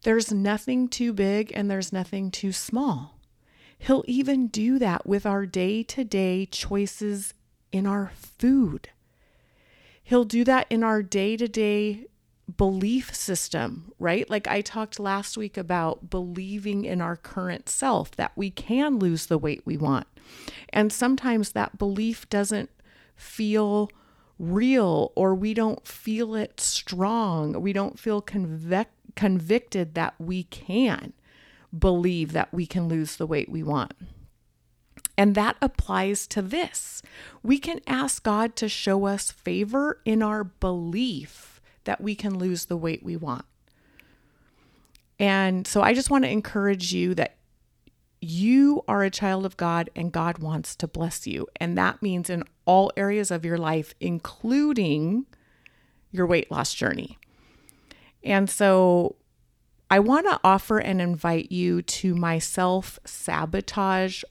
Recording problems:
none

